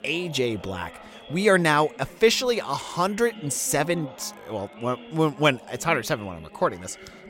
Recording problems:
background chatter; noticeable; throughout; 4 voices, 20 dB below the speech

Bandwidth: 16 kHz